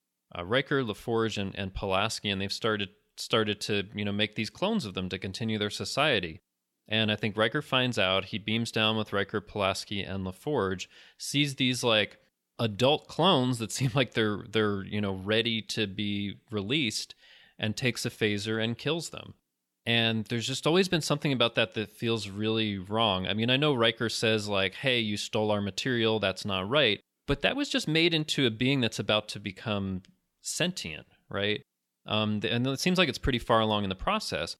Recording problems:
none

